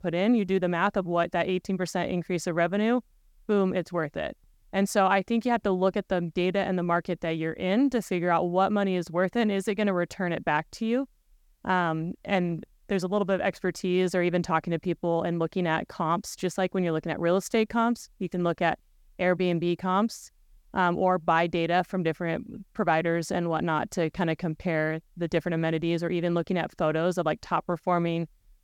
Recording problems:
none

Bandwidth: 18 kHz